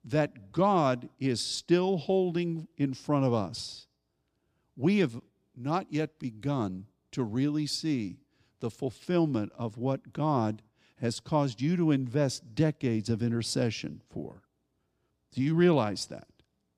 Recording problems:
none

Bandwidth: 15 kHz